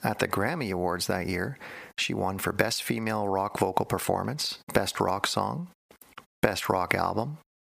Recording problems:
squashed, flat; heavily

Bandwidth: 15 kHz